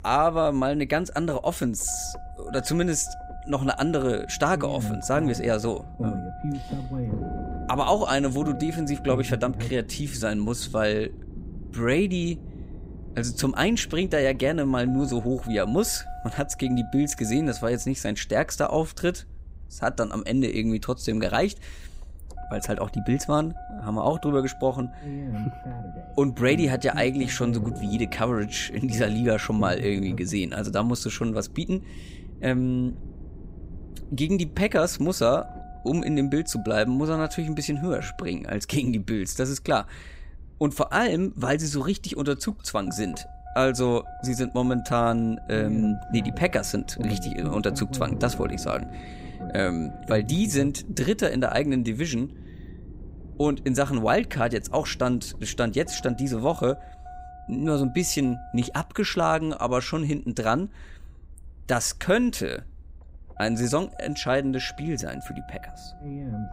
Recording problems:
low rumble; noticeable; throughout; 15 dB below the speech

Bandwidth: 15.5 kHz